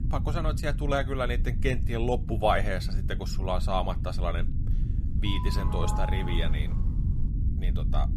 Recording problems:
low rumble; noticeable; throughout; 15 dB below the speech
doorbell; noticeable; from 5.5 to 7 s; peak 5 dB below the speech

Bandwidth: 14.5 kHz